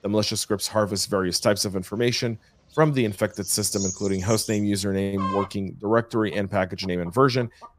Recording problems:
animal sounds; loud; throughout; 10 dB below the speech

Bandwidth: 15 kHz